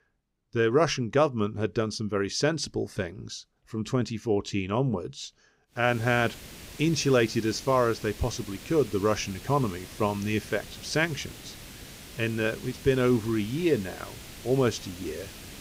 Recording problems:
hiss; noticeable; from 6 s on; 15 dB below the speech

